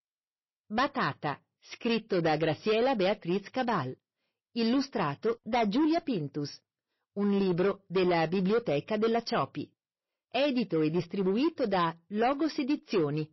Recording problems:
distortion; slight; 9% of the sound clipped
garbled, watery; slightly; nothing above 5.5 kHz

